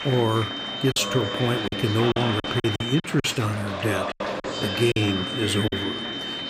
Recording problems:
high-pitched whine; loud; until 3 s and from 4.5 s on; 3 kHz, 6 dB below the speech
murmuring crowd; loud; throughout; 6 dB below the speech
choppy; very; 8% of the speech affected

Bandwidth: 15.5 kHz